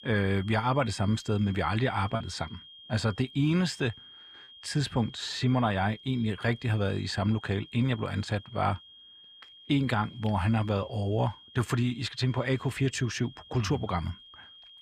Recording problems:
high-pitched whine; noticeable; throughout; 3 kHz, 20 dB below the speech
choppy; occasionally; at 2 s; 1% of the speech affected

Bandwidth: 14.5 kHz